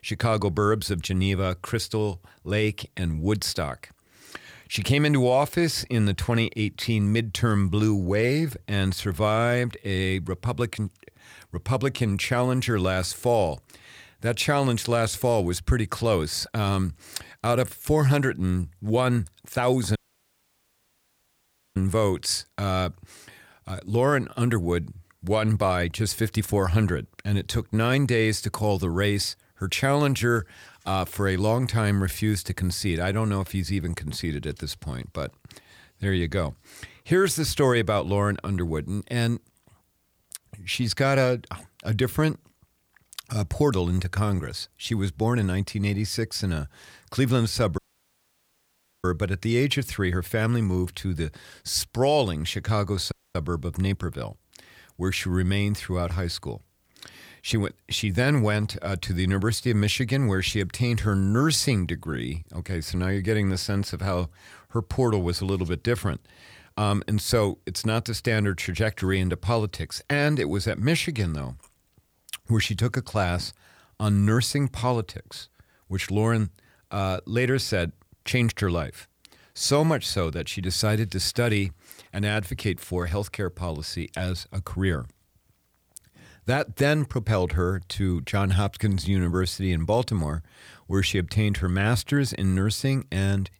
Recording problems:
audio cutting out; at 20 s for 2 s, at 48 s for 1.5 s and at 53 s

